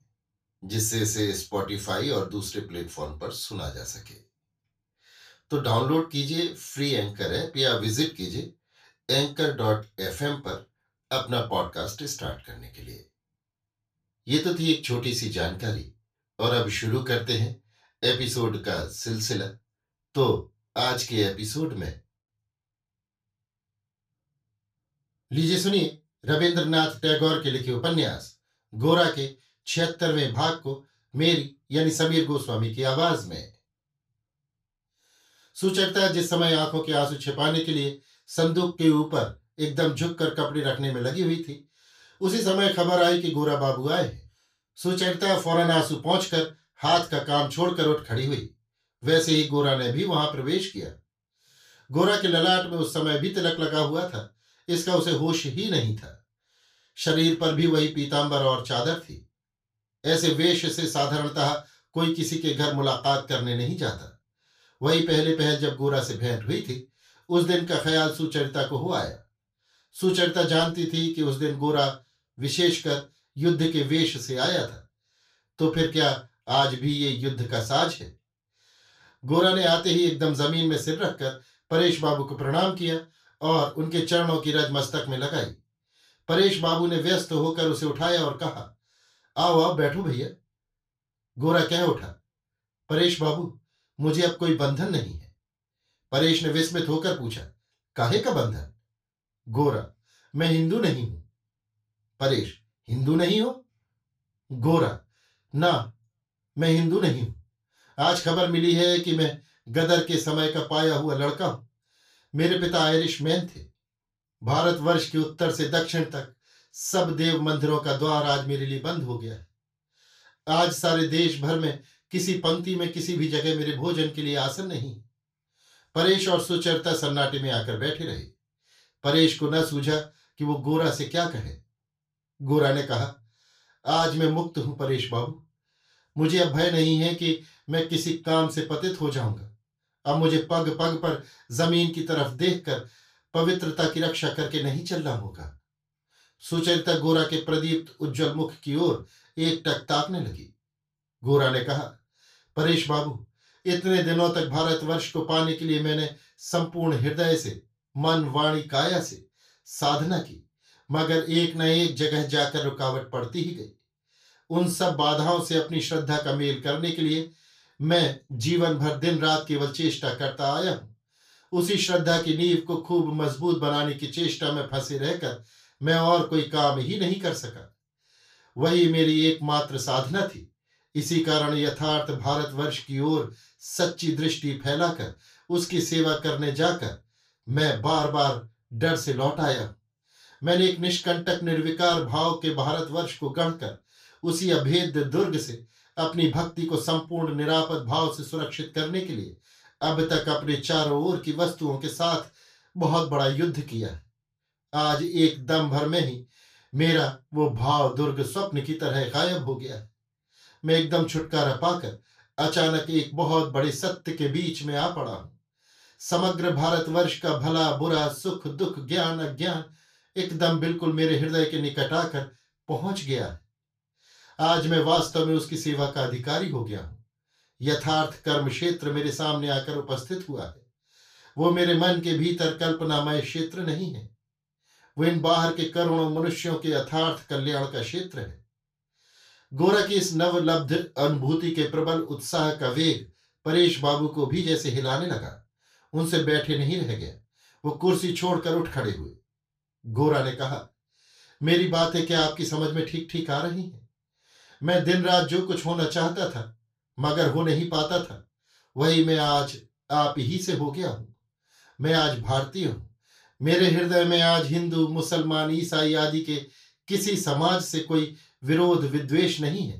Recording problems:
off-mic speech; far
room echo; slight; dies away in 0.2 s

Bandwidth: 14.5 kHz